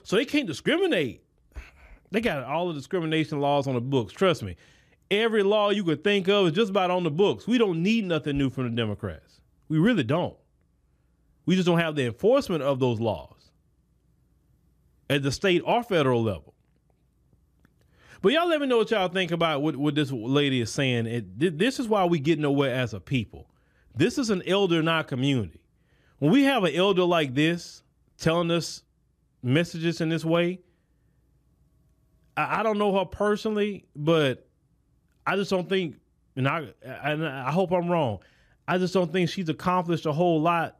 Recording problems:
none

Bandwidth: 14.5 kHz